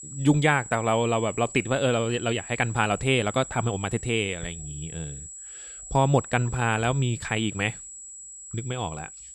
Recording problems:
high-pitched whine; noticeable; throughout; 7.5 kHz, 15 dB below the speech

